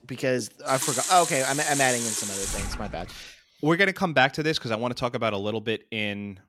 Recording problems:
household noises; loud; until 2.5 s; 3 dB below the speech

